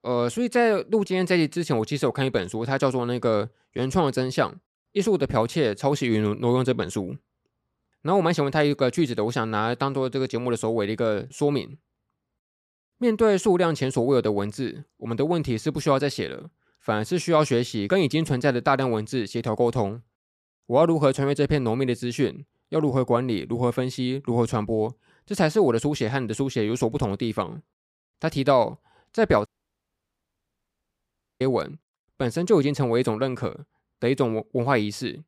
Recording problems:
audio cutting out; at 29 s for 2 s

